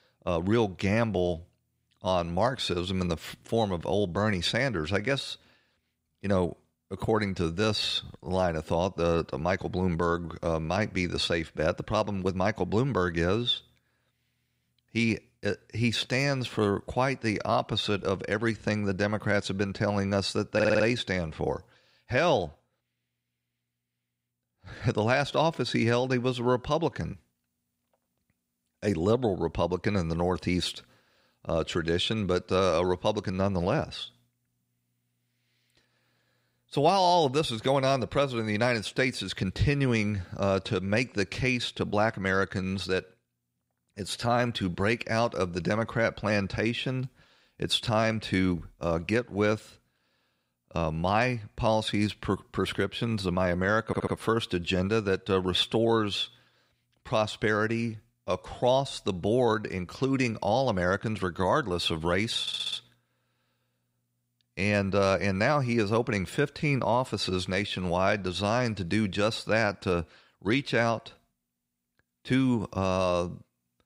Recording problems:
audio stuttering; at 21 s, at 54 s and at 1:02

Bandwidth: 15.5 kHz